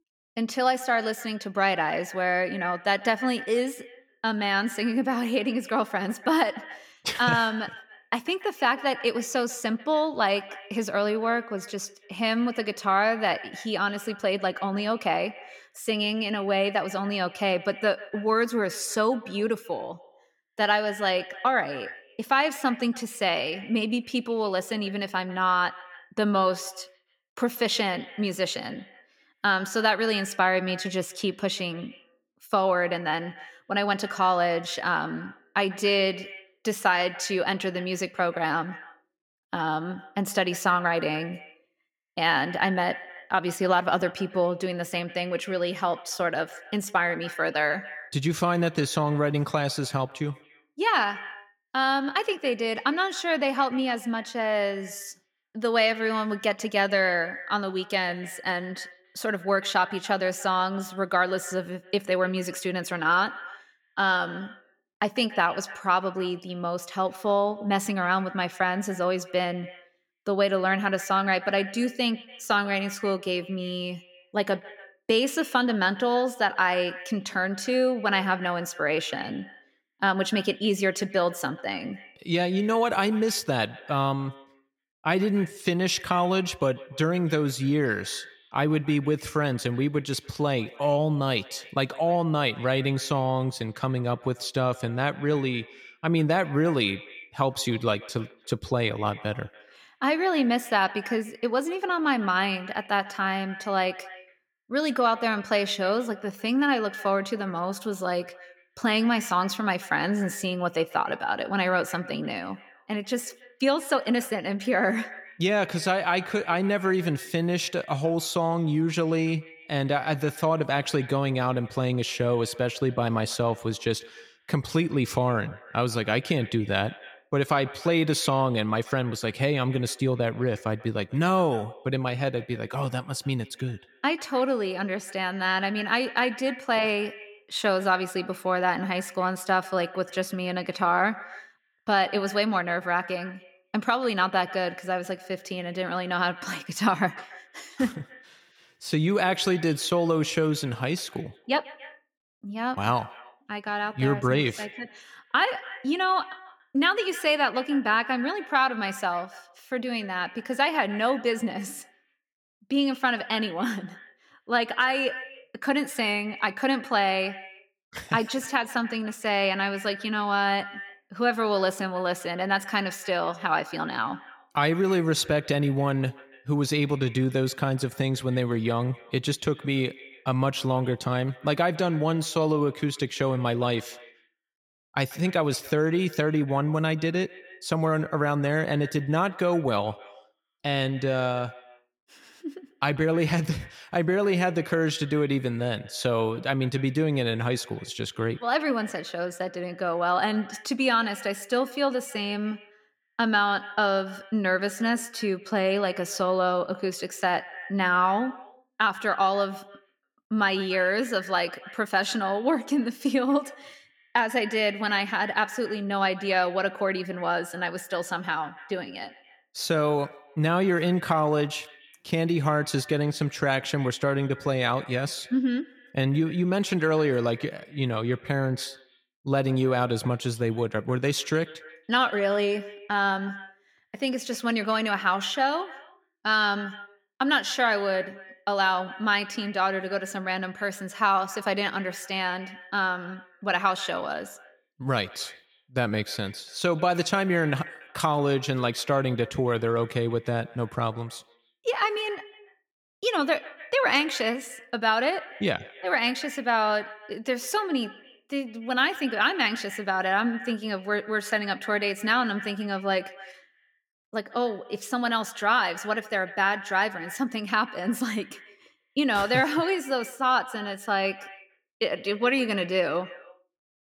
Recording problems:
echo of what is said; noticeable; throughout; 140 ms later, 15 dB below the speech

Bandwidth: 17 kHz